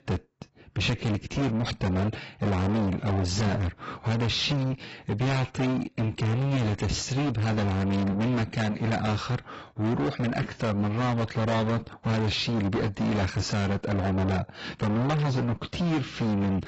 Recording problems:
distortion; heavy; 6 dB below the speech
garbled, watery; badly; nothing above 7.5 kHz

